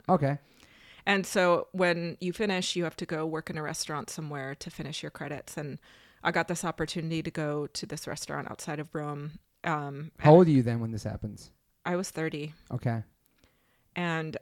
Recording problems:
none

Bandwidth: 18 kHz